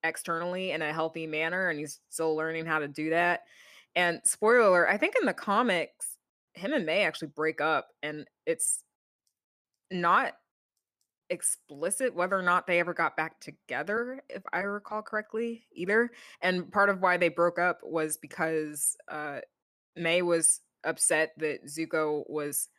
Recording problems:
none

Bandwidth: 14.5 kHz